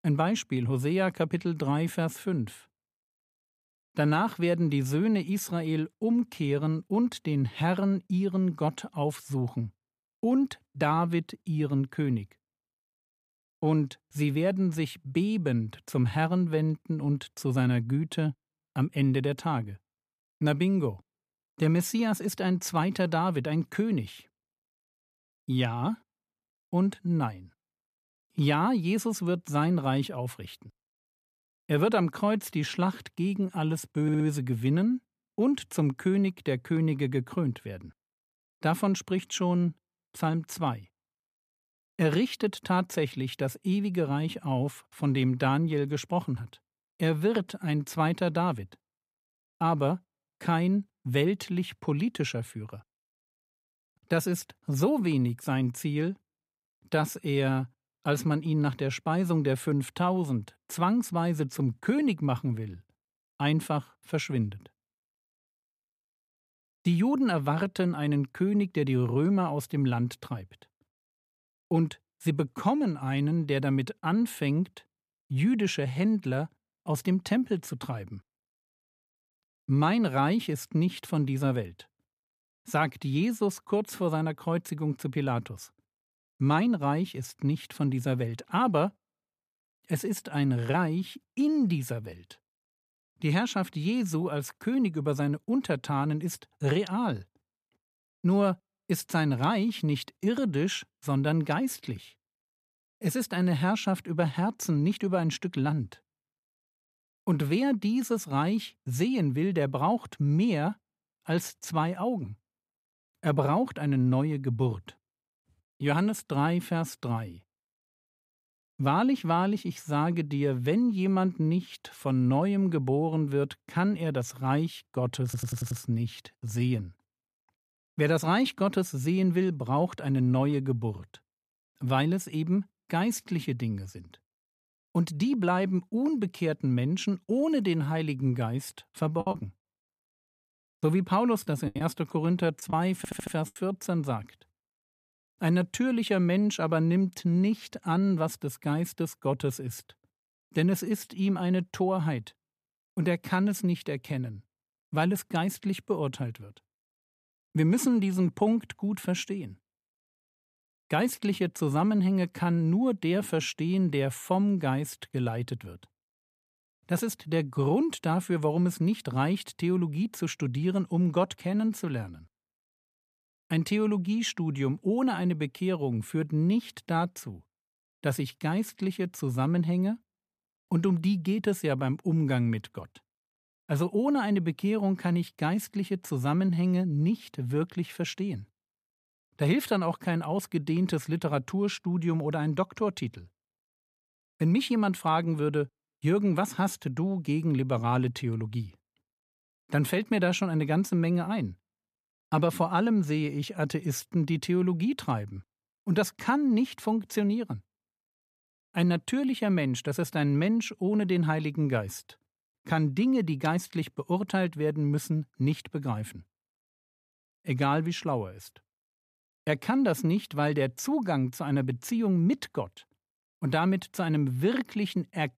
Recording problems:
audio stuttering; at 34 s, at 2:05 and at 2:23
choppy; very; from 2:19 to 2:24; 10% of the speech affected

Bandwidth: 14.5 kHz